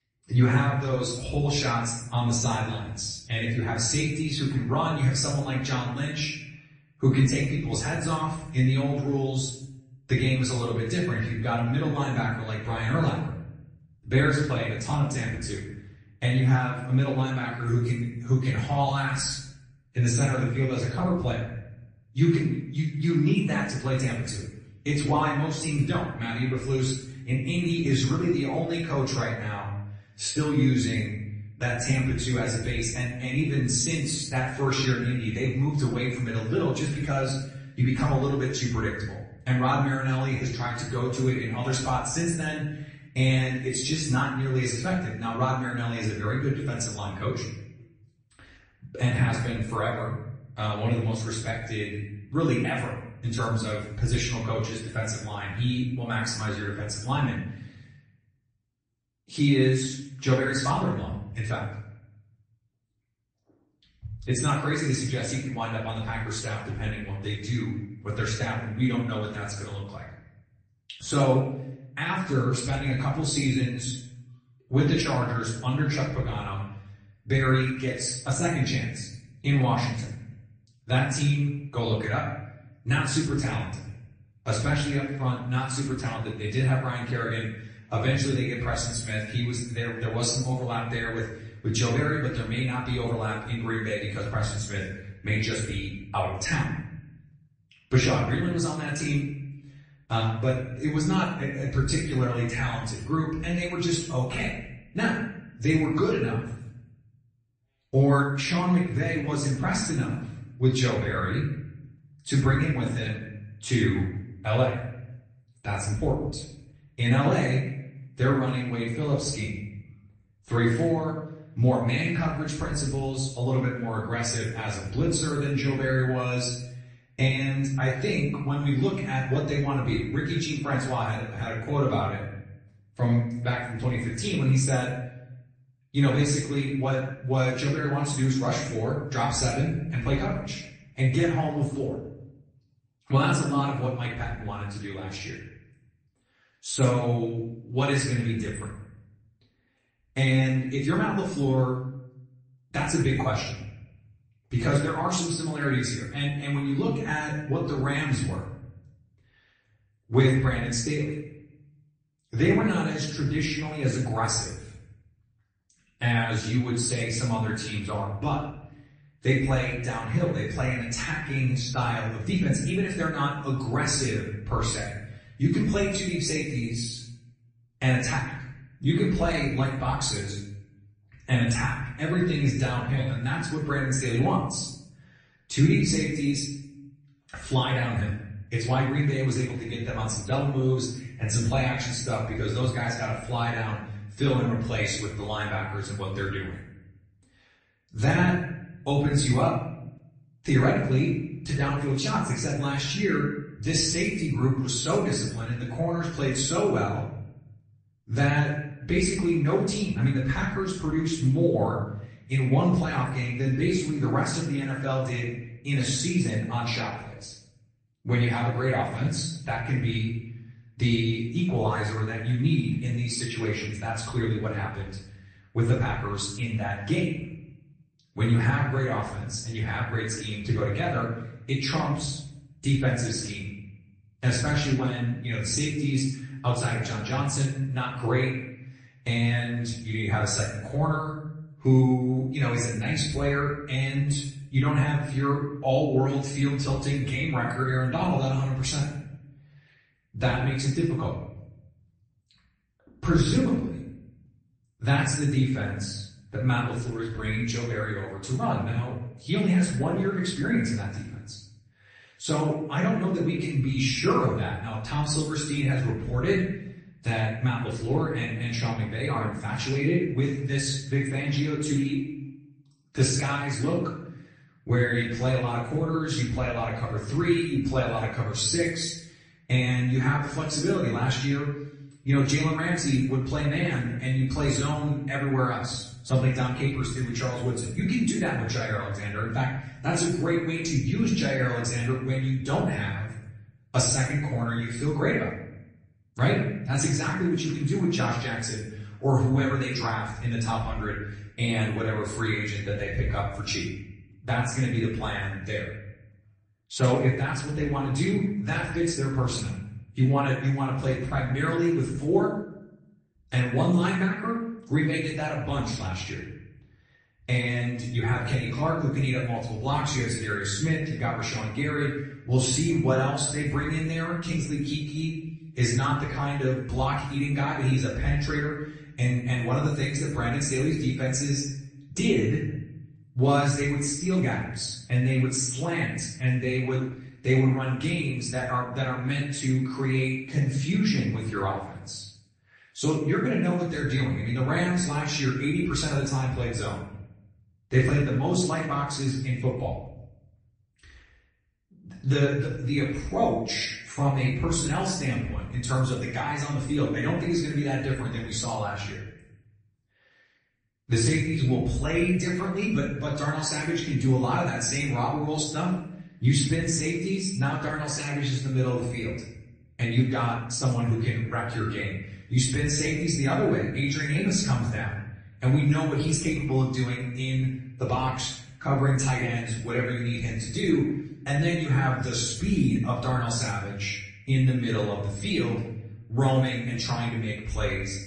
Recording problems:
off-mic speech; far
room echo; noticeable; dies away in 0.8 s
garbled, watery; slightly; nothing above 8 kHz

